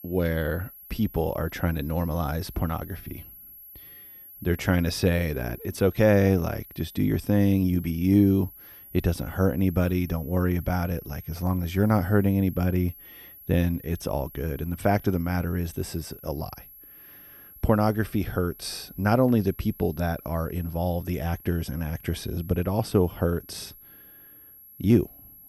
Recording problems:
high-pitched whine; noticeable; throughout; 11.5 kHz, 20 dB below the speech

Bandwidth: 14.5 kHz